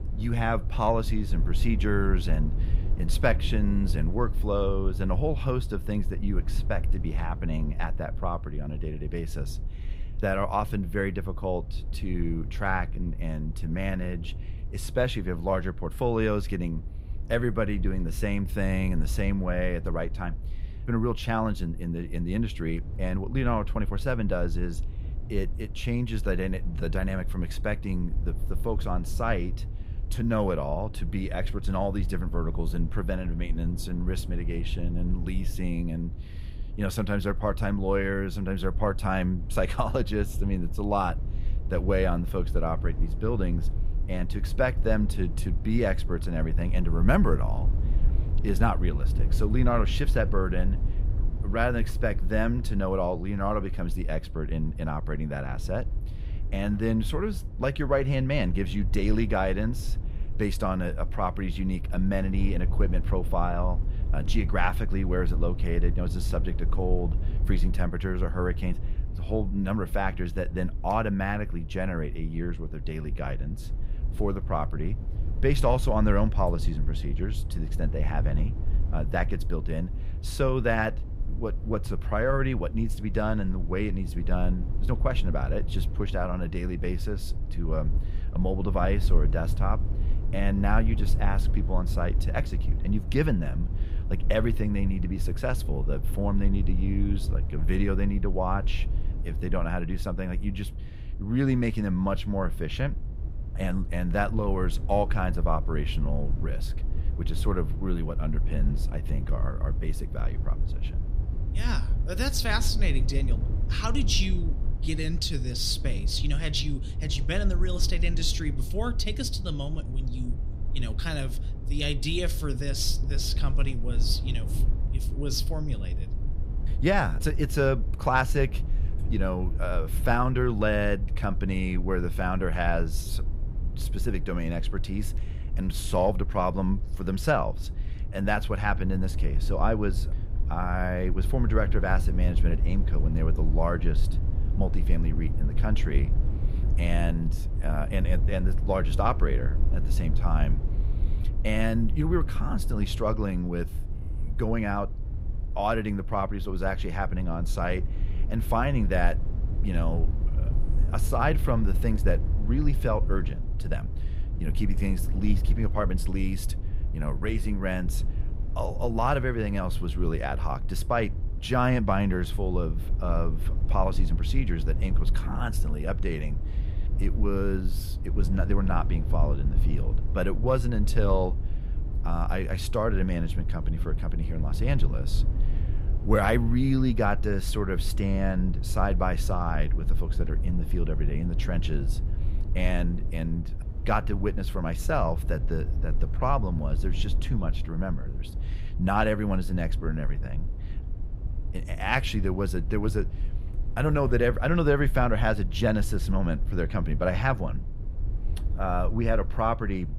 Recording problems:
low rumble; noticeable; throughout; 15 dB below the speech

